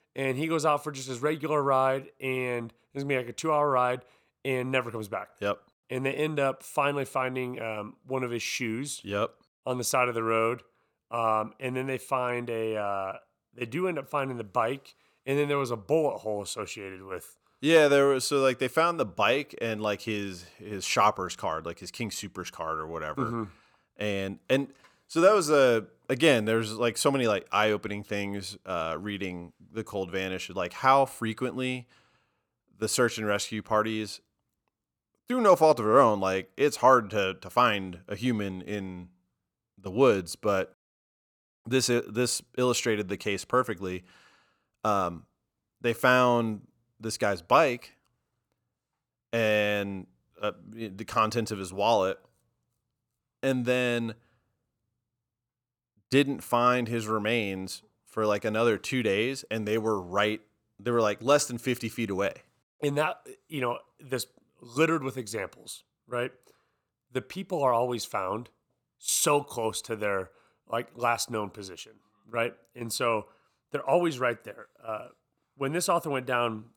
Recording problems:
none

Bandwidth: 18.5 kHz